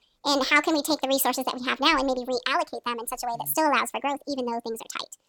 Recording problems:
wrong speed and pitch; too fast and too high; 1.5 times normal speed

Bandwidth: 17 kHz